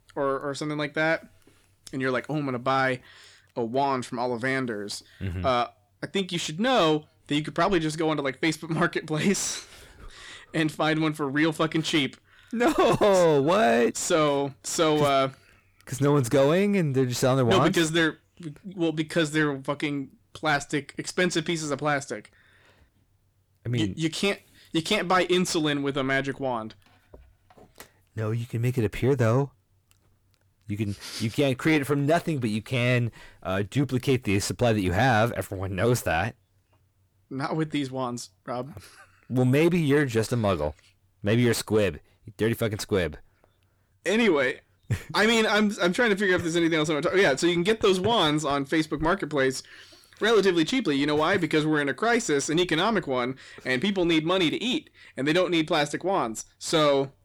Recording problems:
distortion; slight; 10 dB below the speech

